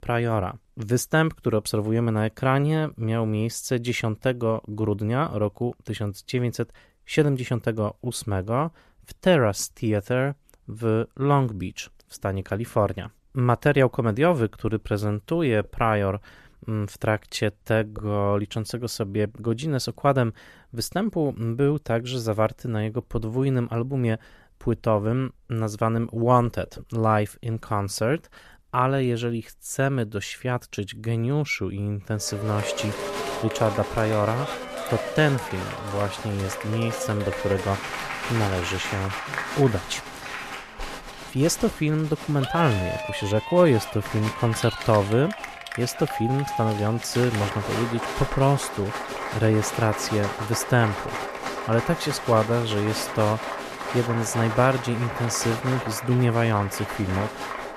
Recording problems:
crowd noise; loud; from 33 s on; 7 dB below the speech

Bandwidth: 14 kHz